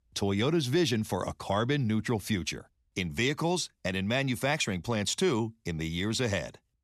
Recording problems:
none

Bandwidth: 13.5 kHz